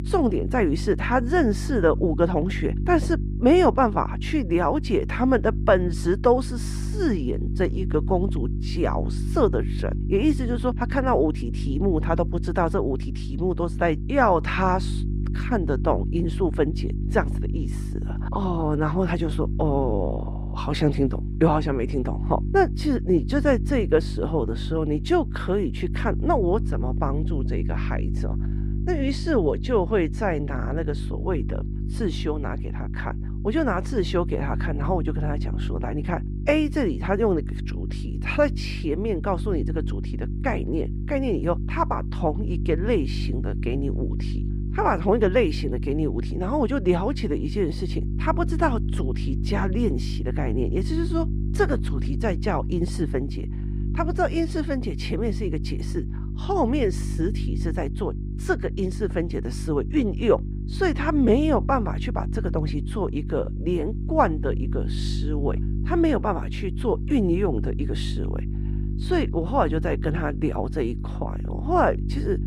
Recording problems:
muffled; very; fading above 4 kHz
electrical hum; noticeable; throughout; 50 Hz, 15 dB below the speech

